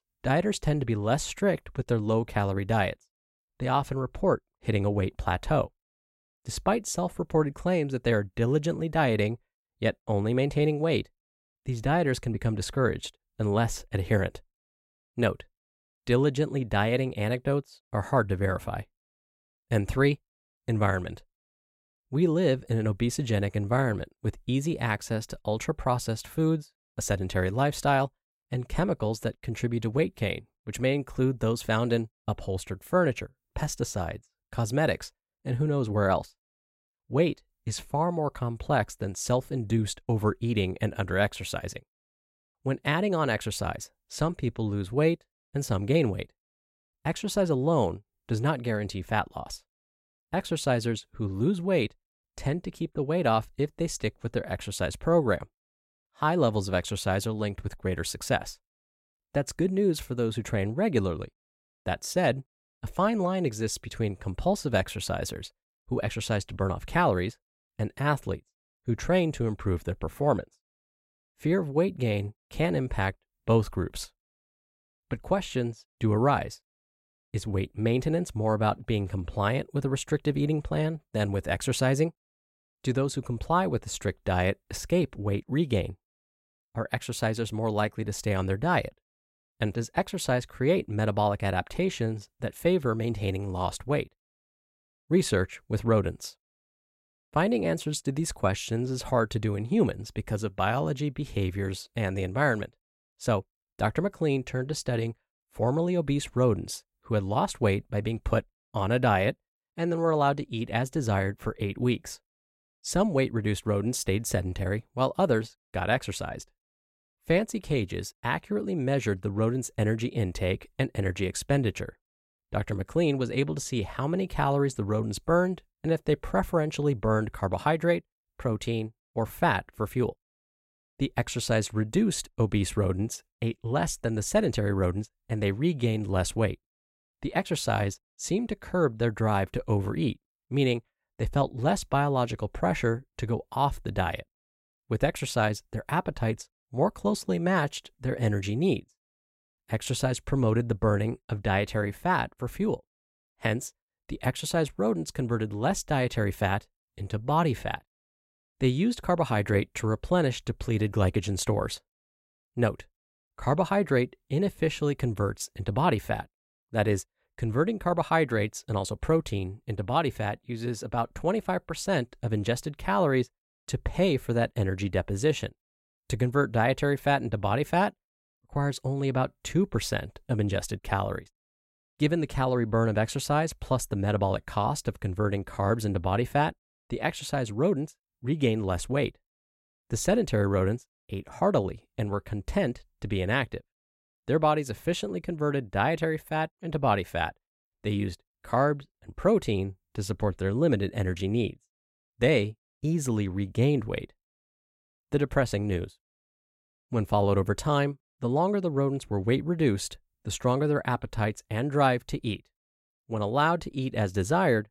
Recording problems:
none

